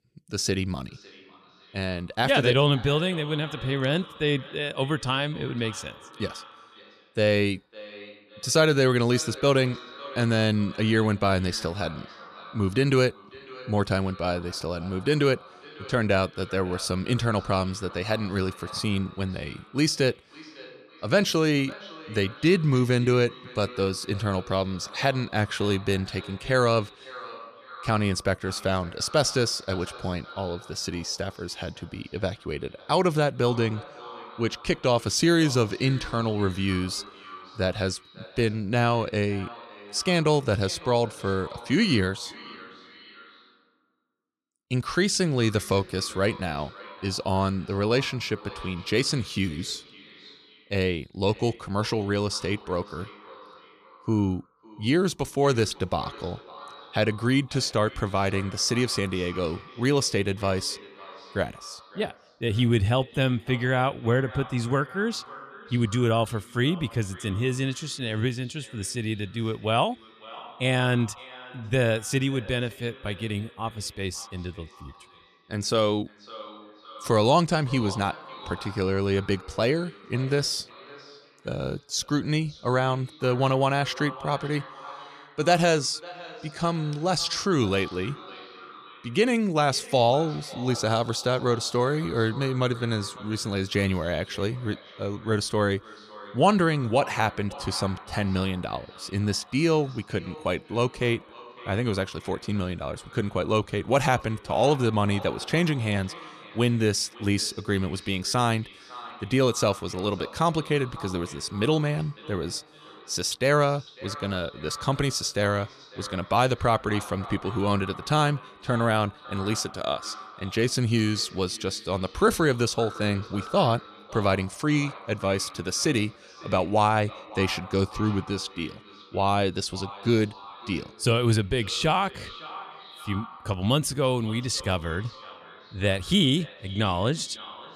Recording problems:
echo of what is said; noticeable; throughout; 550 ms later, 20 dB below the speech

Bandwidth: 14.5 kHz